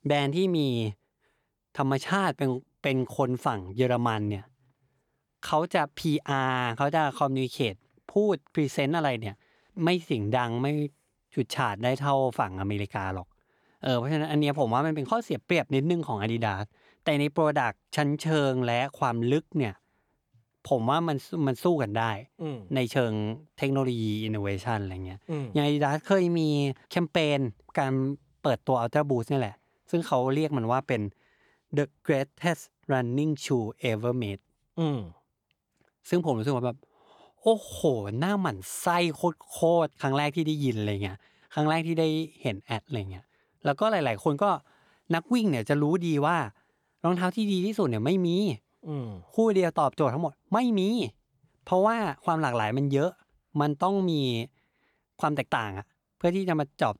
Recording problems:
none

